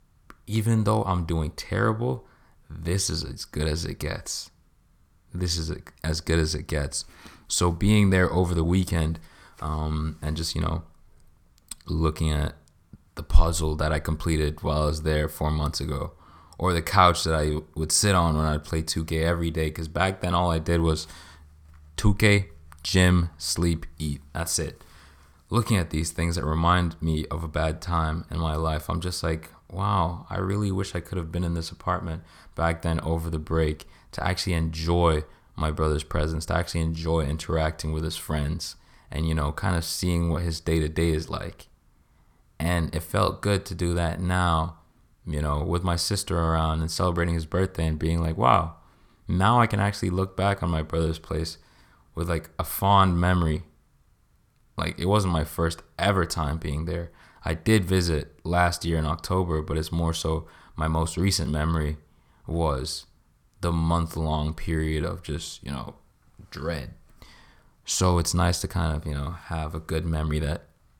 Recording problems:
none

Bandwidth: 18.5 kHz